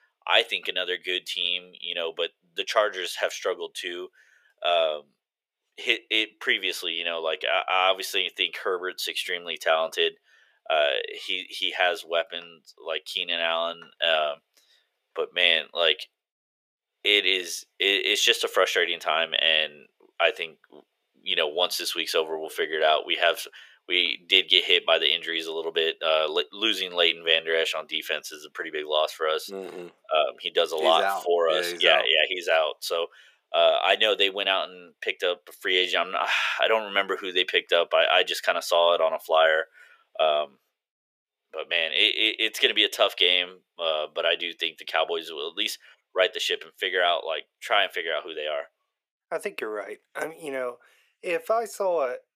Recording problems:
thin; very; fading below 450 Hz

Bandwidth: 15 kHz